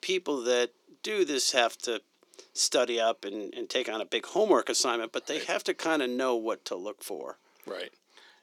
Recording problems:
thin; somewhat; fading below 300 Hz

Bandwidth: 18.5 kHz